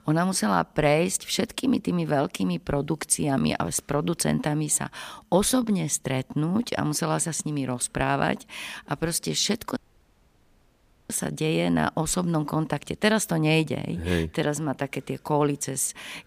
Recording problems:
audio cutting out; at 10 s for 1.5 s

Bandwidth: 15 kHz